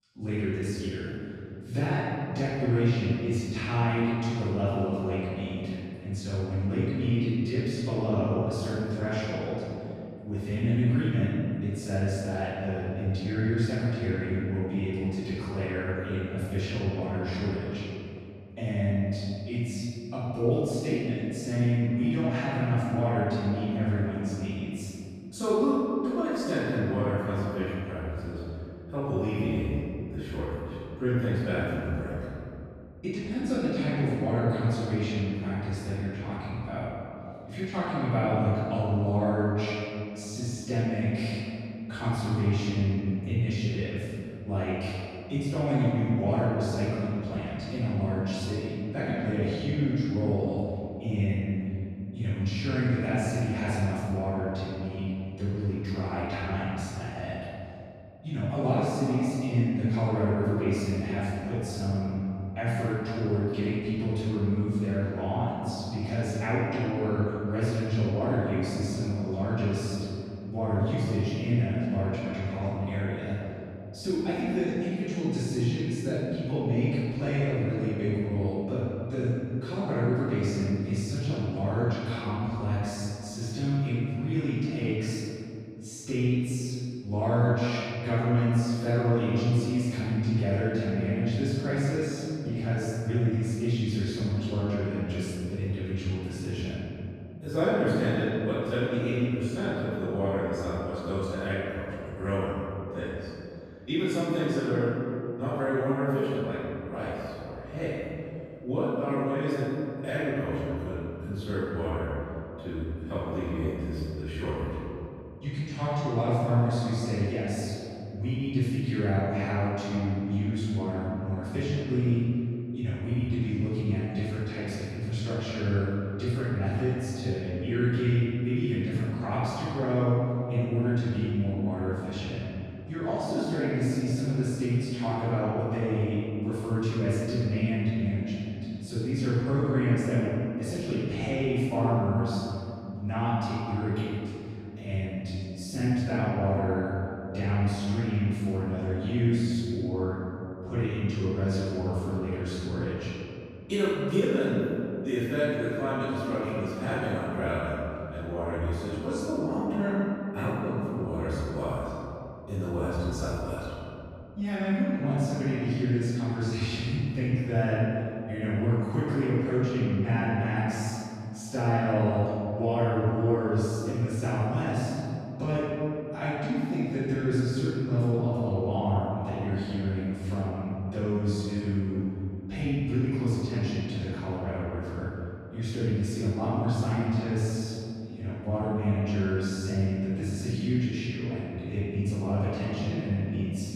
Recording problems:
room echo; strong; dies away in 2.7 s
off-mic speech; far

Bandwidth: 14.5 kHz